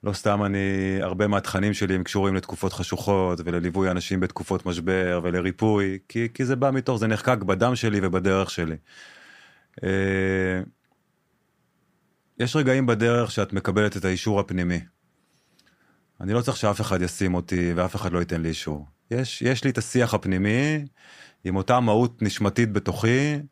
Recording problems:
none

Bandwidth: 15 kHz